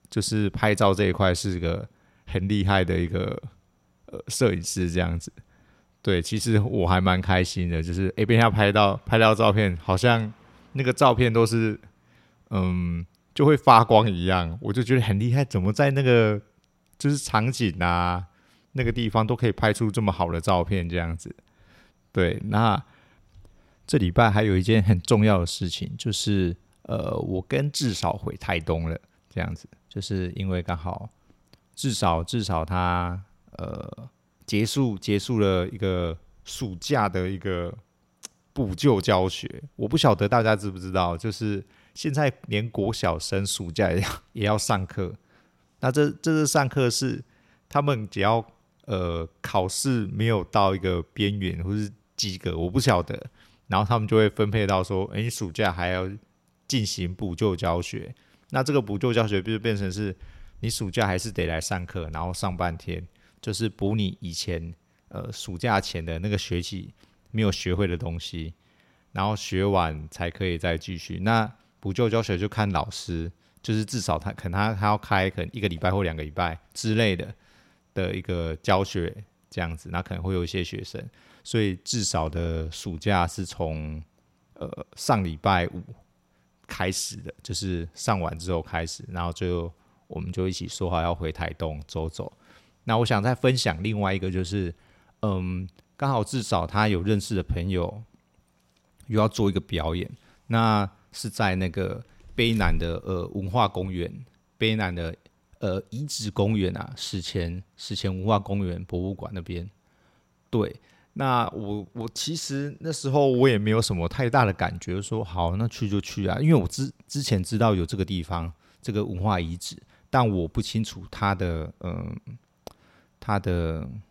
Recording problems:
none

